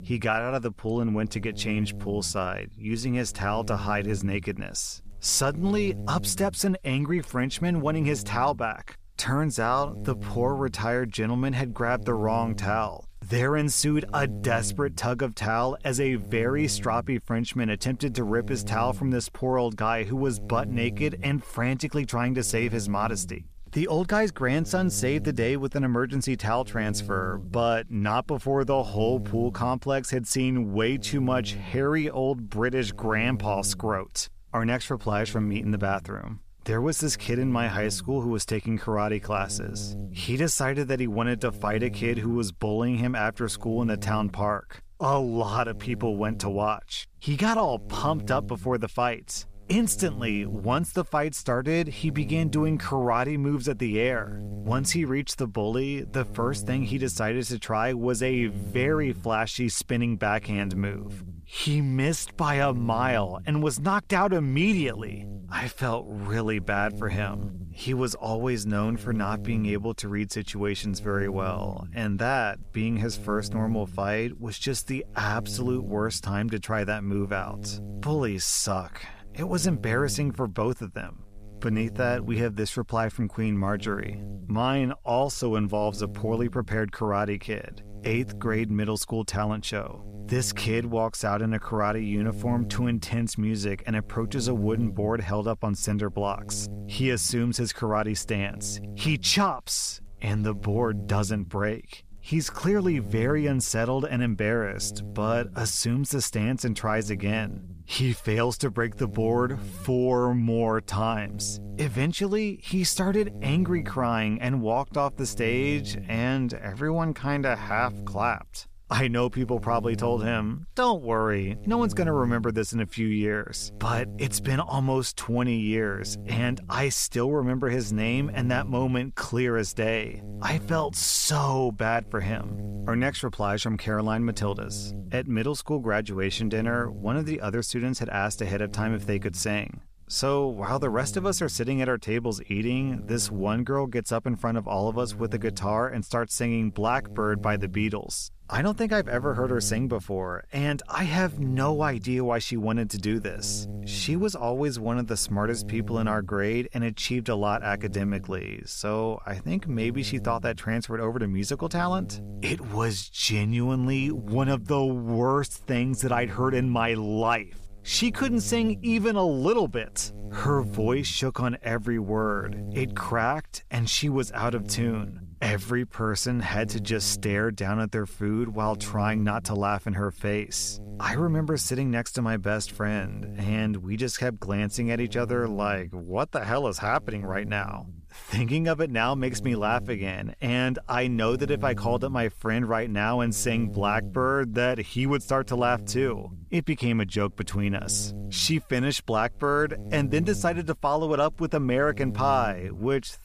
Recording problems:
electrical hum; noticeable; throughout; 60 Hz, 20 dB below the speech

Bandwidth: 14.5 kHz